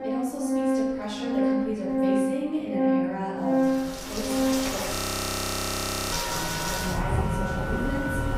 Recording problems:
off-mic speech; far
room echo; noticeable; dies away in 1.2 s
background music; very loud; throughout; 6 dB above the speech
rain or running water; very loud; from 4 s on; 4 dB above the speech
audio freezing; at 5 s for 1 s

